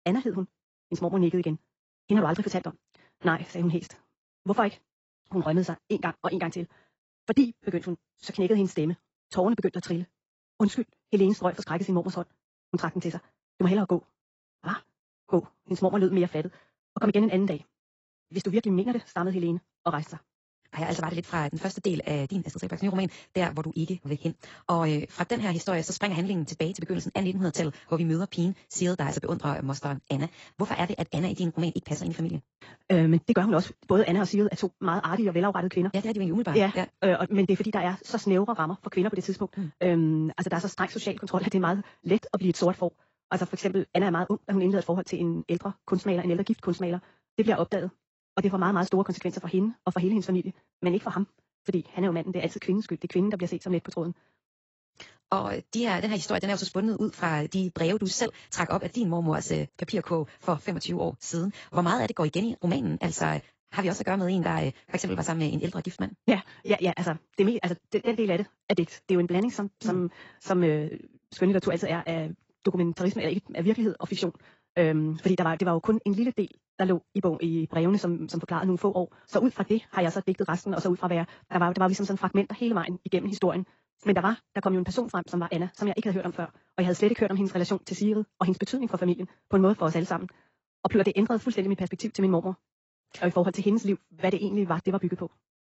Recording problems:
garbled, watery; badly; nothing above 7.5 kHz
wrong speed, natural pitch; too fast; 1.7 times normal speed

